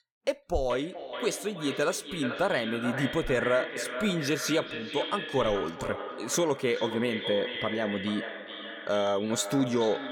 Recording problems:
echo of what is said; strong; throughout; 430 ms later, 6 dB below the speech

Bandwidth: 17.5 kHz